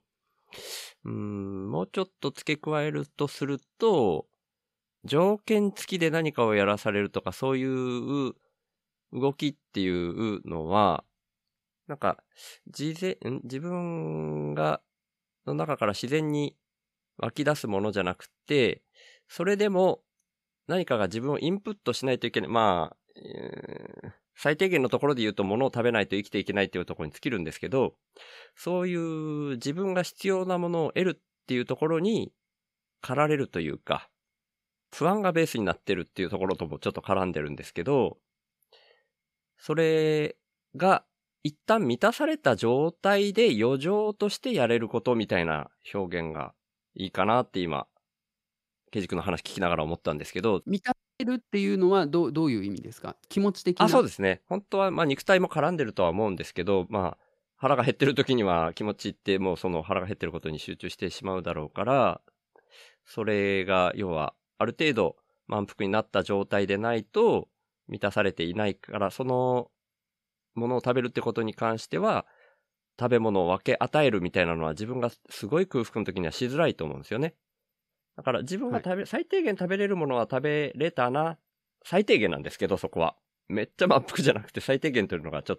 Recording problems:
none

